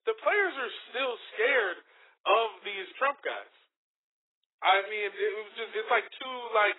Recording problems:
garbled, watery; badly; nothing above 4 kHz
thin; very; fading below 350 Hz

